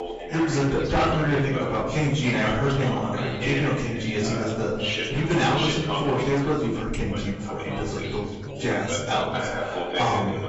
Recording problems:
off-mic speech; far
garbled, watery; badly; nothing above 7.5 kHz
room echo; noticeable; dies away in 0.8 s
distortion; slight; 8% of the sound clipped
background chatter; loud; throughout; 2 voices, 6 dB below the speech

